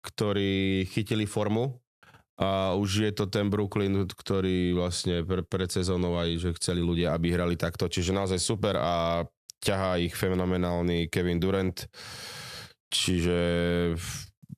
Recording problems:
squashed, flat; somewhat

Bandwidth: 14 kHz